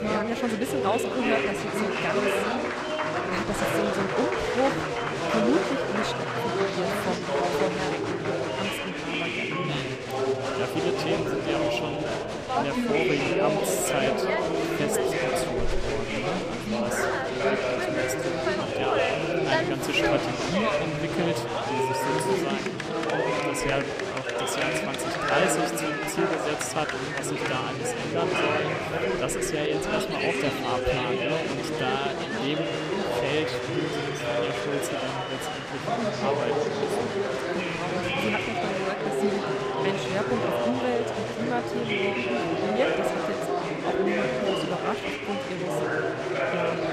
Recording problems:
chatter from many people; very loud; throughout; 5 dB above the speech

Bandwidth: 14.5 kHz